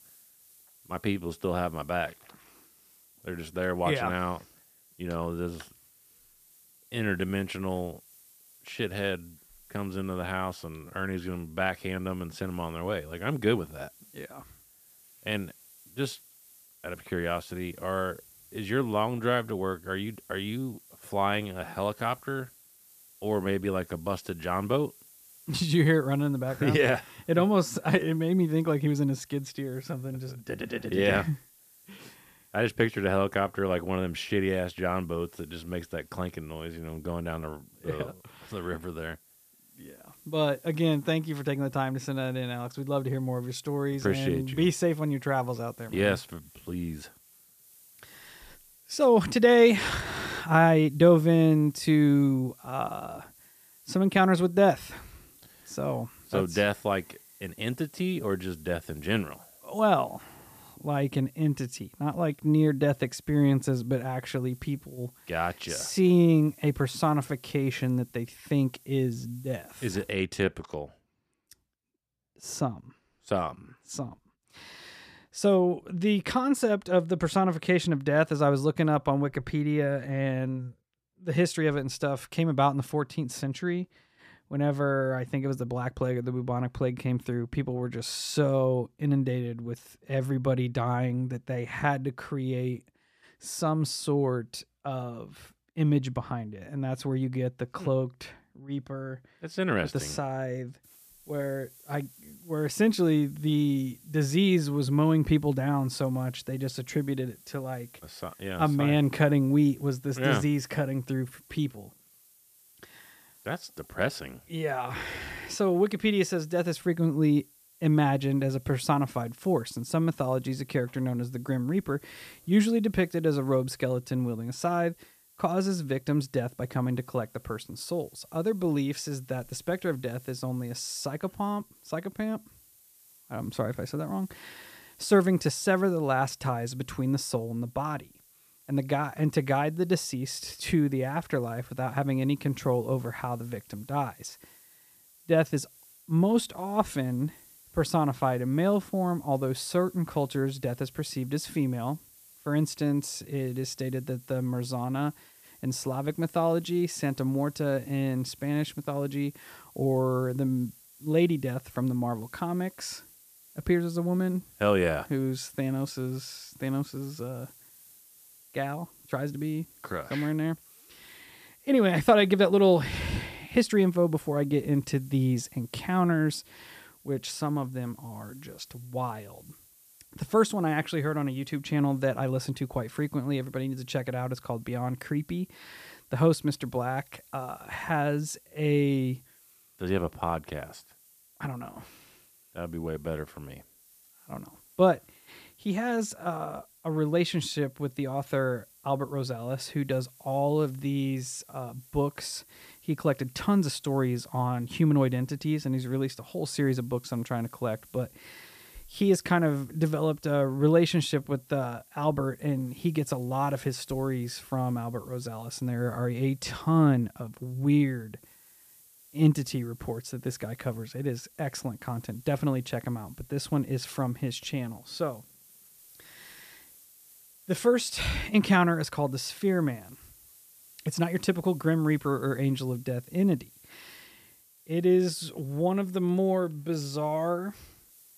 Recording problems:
hiss; faint; until 1:10 and from 1:41 on; 25 dB below the speech

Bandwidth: 14.5 kHz